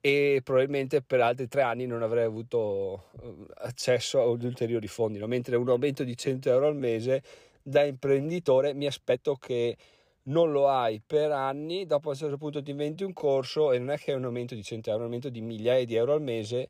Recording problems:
uneven, jittery; strongly; from 1 to 15 s

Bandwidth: 15 kHz